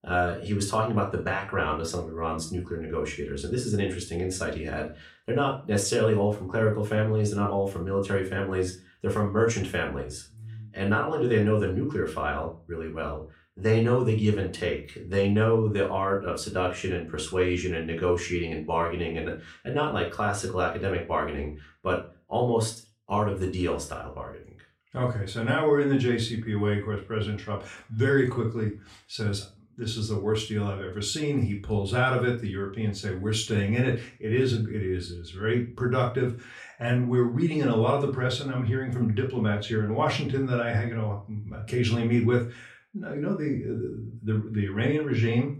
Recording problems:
off-mic speech; far
room echo; slight; dies away in 0.3 s

